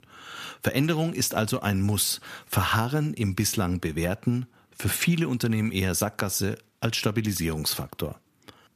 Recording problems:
none

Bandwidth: 14.5 kHz